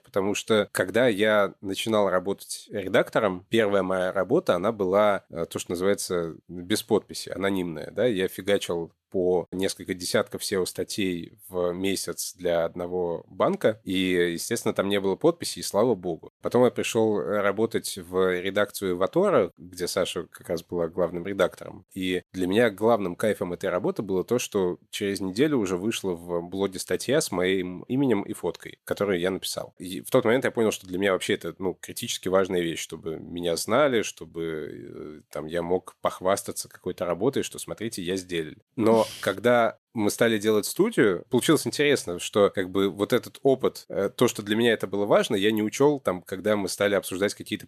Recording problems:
none

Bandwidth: 13.5 kHz